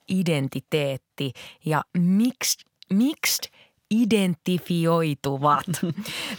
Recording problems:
none

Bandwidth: 17.5 kHz